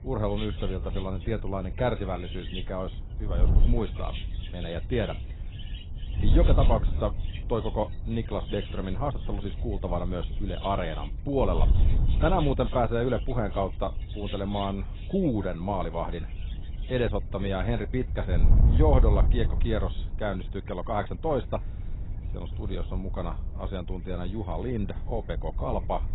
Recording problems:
garbled, watery; badly; nothing above 4 kHz
animal sounds; noticeable; throughout; 15 dB below the speech
wind noise on the microphone; occasional gusts; 15 dB below the speech

